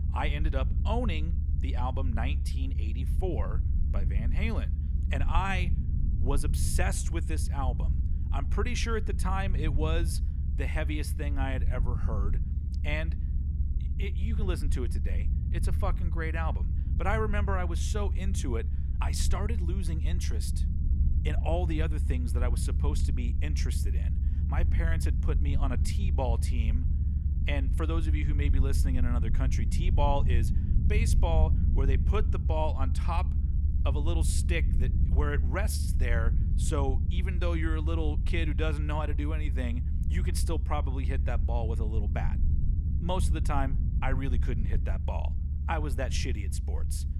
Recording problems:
low rumble; loud; throughout; 10 dB below the speech

